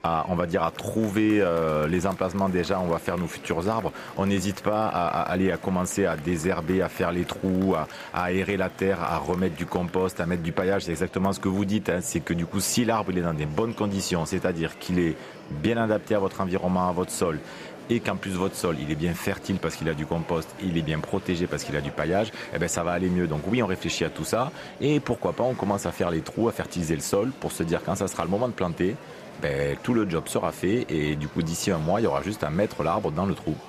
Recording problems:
murmuring crowd; noticeable; throughout; 15 dB below the speech

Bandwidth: 14.5 kHz